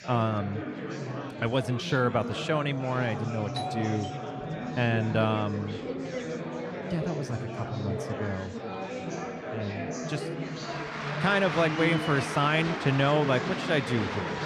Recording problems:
murmuring crowd; loud; throughout; 5 dB below the speech
doorbell; noticeable; from 3.5 to 5.5 s; peak 6 dB below the speech

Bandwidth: 14.5 kHz